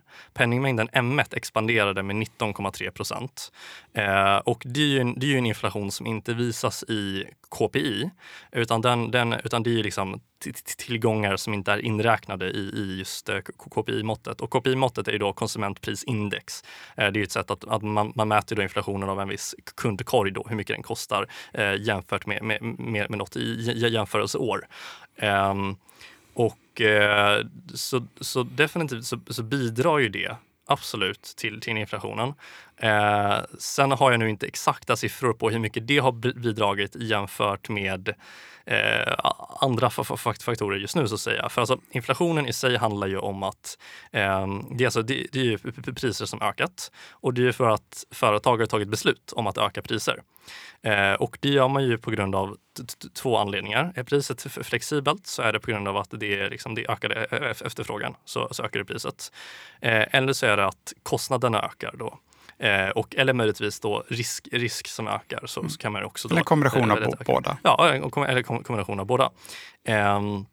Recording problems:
none

